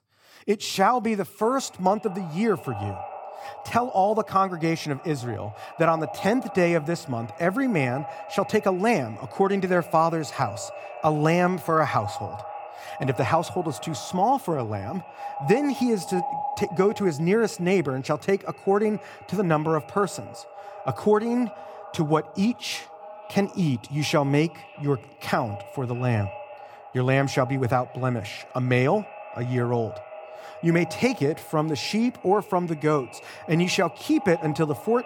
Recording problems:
echo of what is said; noticeable; throughout; 600 ms later, 15 dB below the speech

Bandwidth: 18.5 kHz